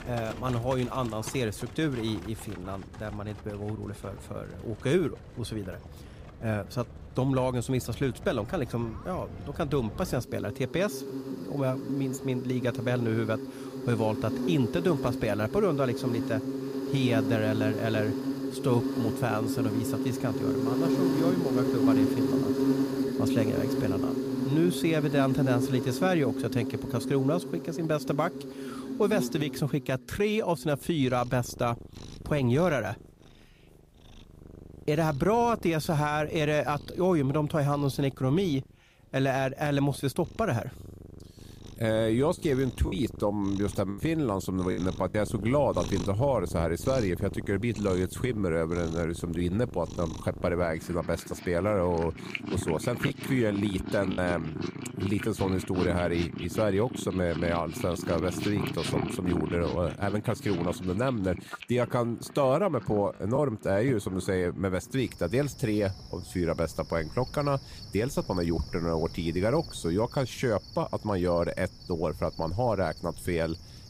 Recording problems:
animal sounds; loud; throughout; 5 dB below the speech
choppy; occasionally; from 43 to 45 s, from 53 to 54 s and at 1:03; 4% of the speech affected

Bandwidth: 15 kHz